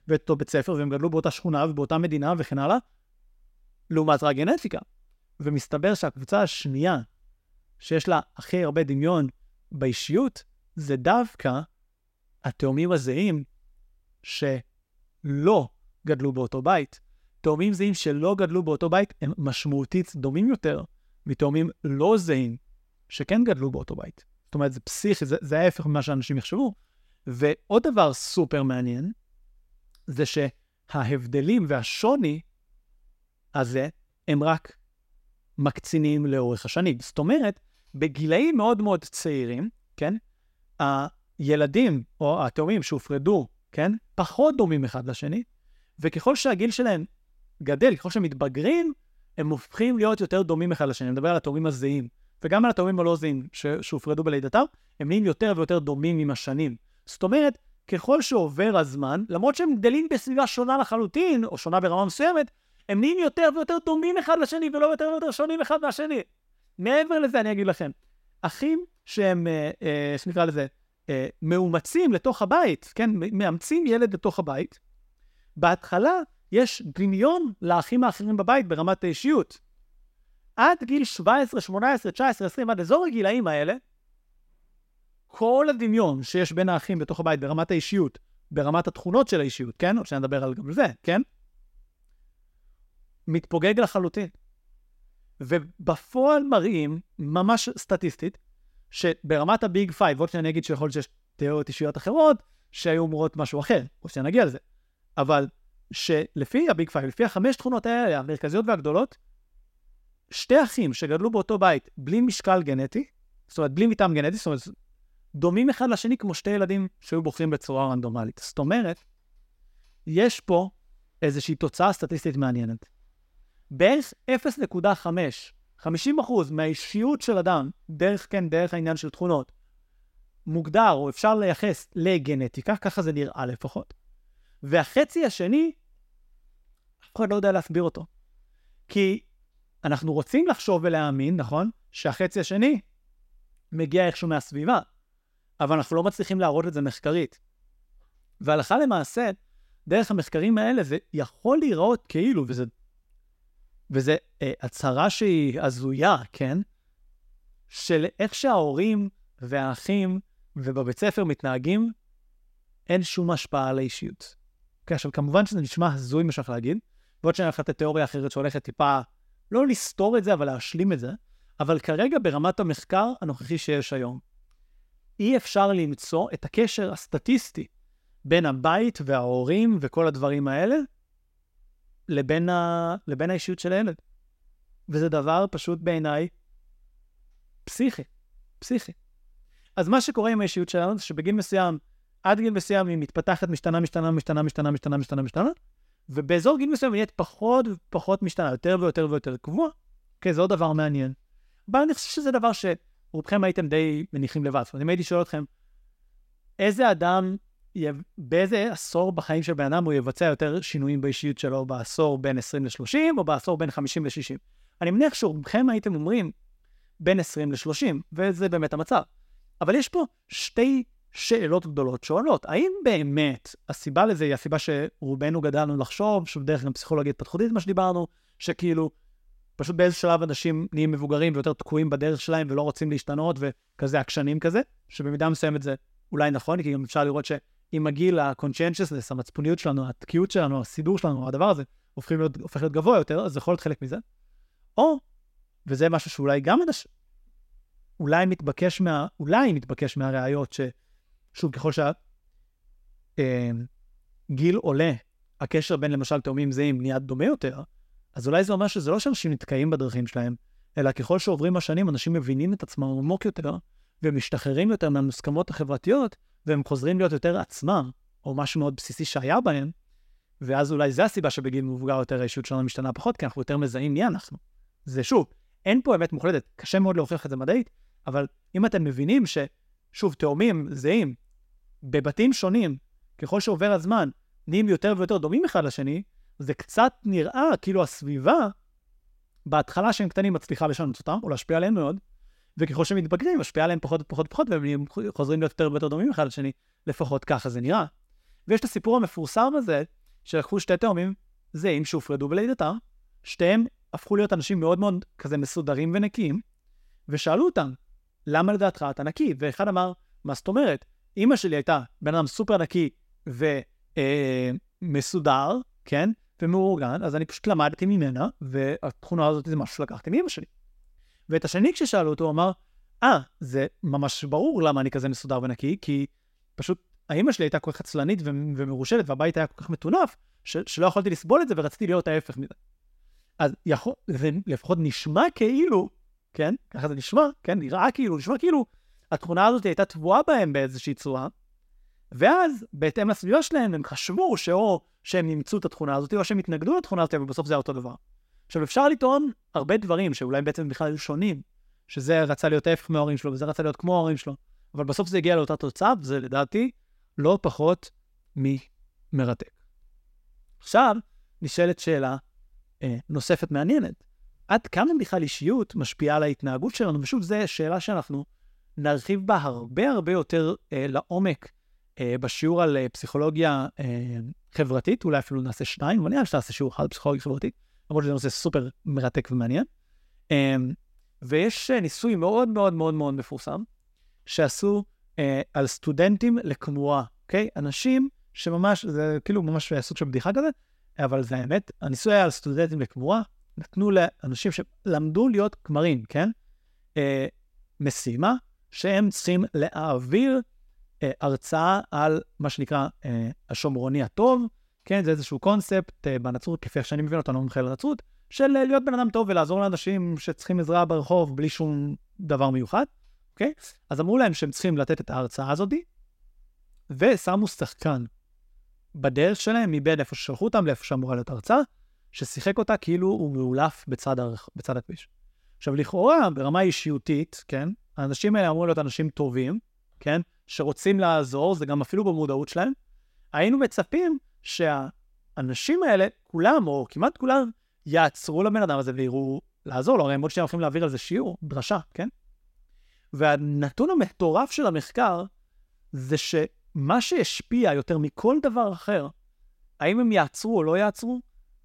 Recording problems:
none

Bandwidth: 16 kHz